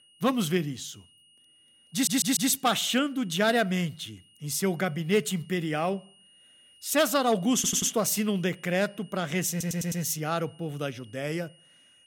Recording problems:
high-pitched whine; faint; throughout; 3 kHz, 30 dB below the speech
audio stuttering; at 2 s, at 7.5 s and at 9.5 s

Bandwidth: 17 kHz